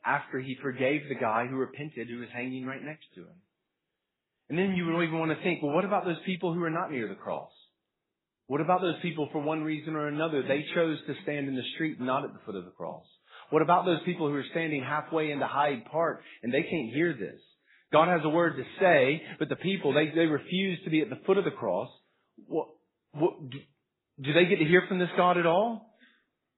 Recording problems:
garbled, watery; badly; nothing above 4 kHz

